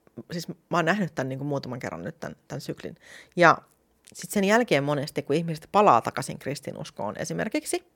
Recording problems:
none

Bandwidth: 17.5 kHz